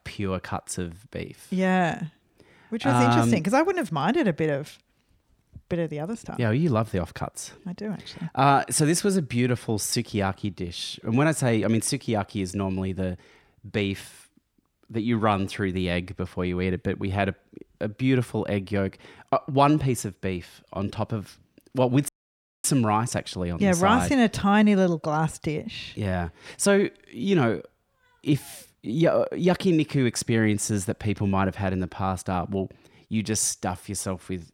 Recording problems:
audio cutting out; at 22 s for 0.5 s

